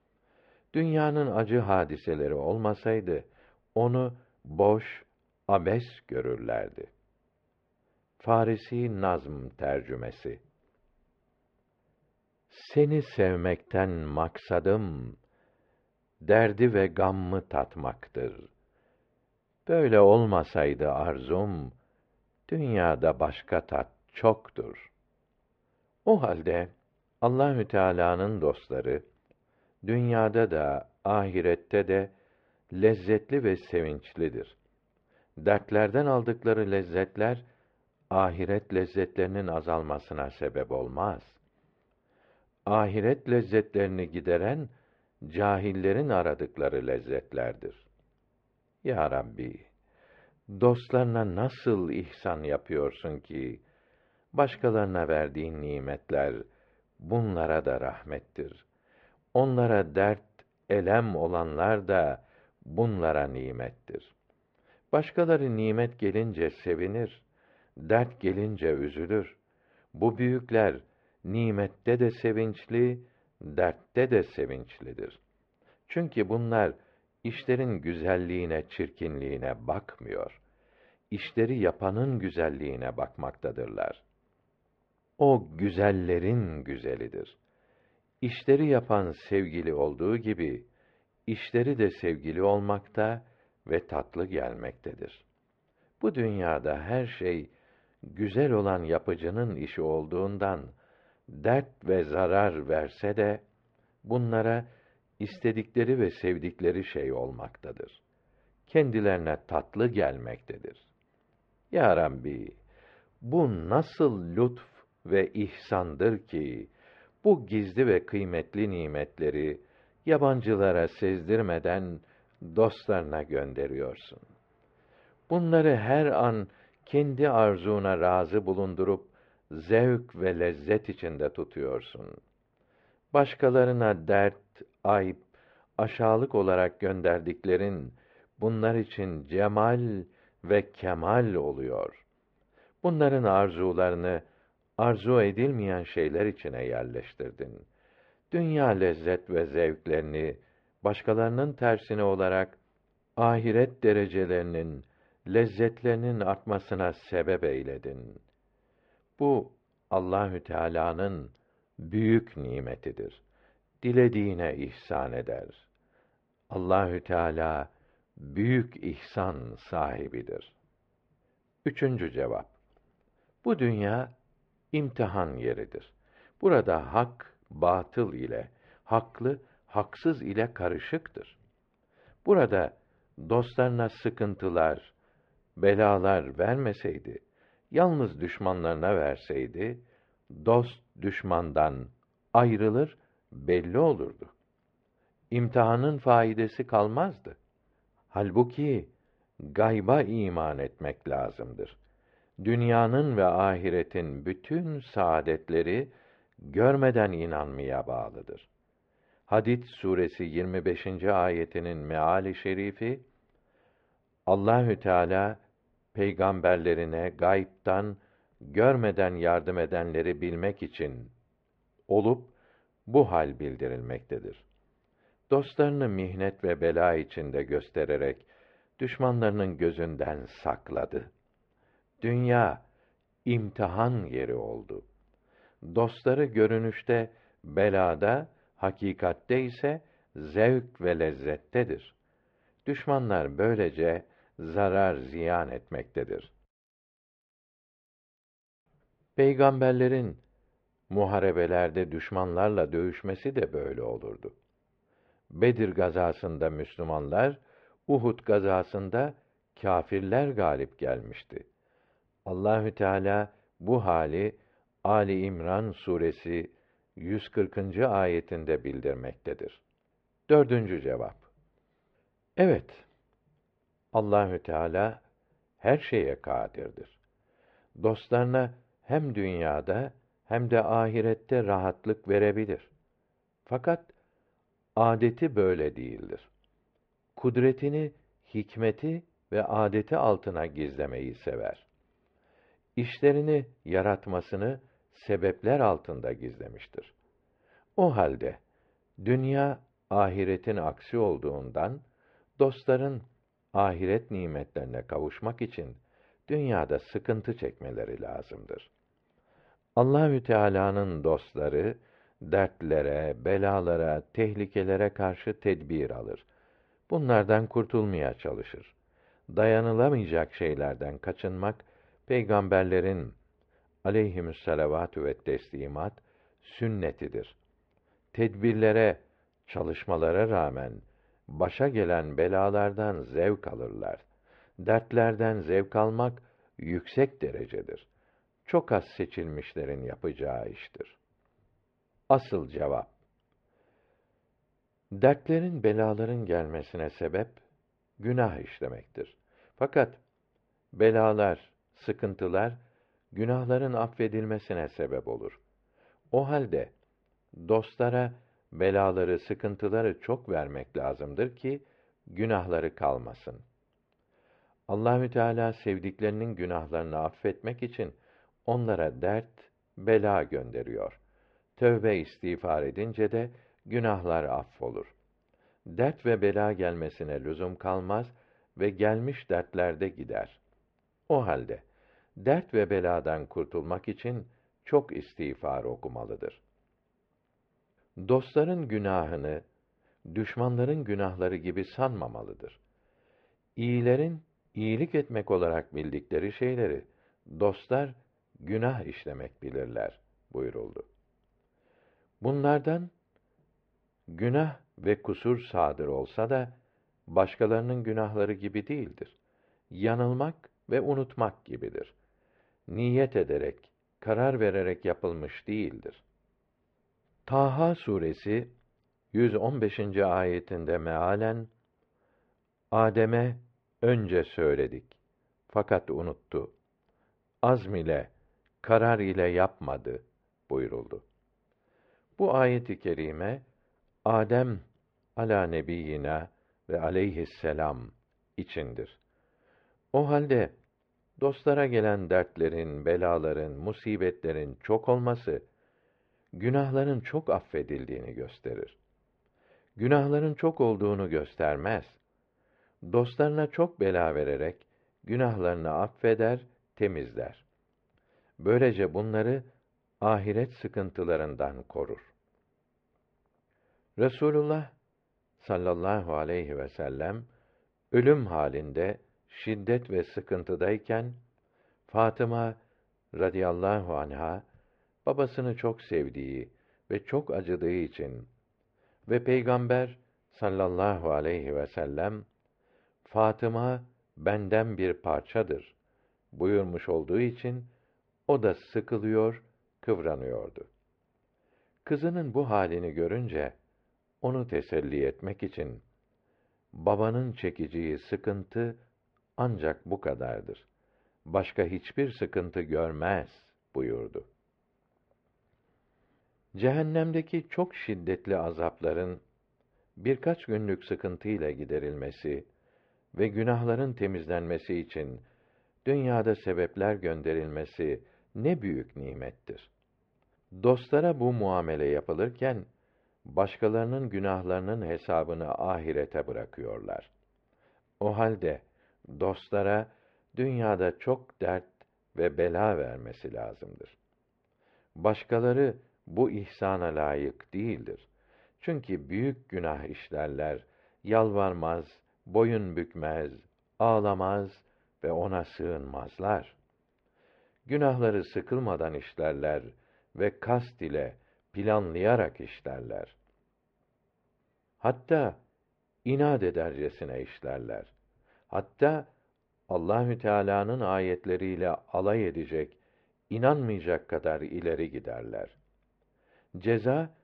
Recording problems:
muffled; very; fading above 2.5 kHz

